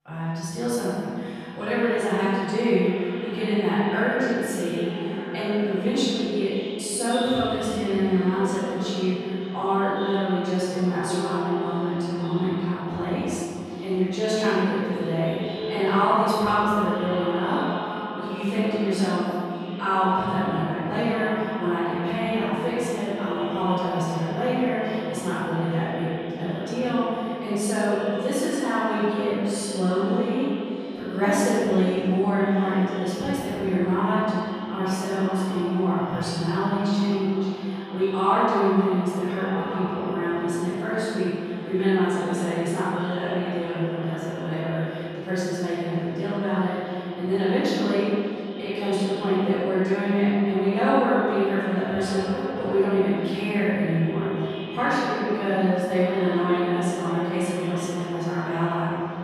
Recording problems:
echo of what is said; strong; throughout; 550 ms later, 10 dB below the speech
room echo; strong; dies away in 2.3 s
off-mic speech; far

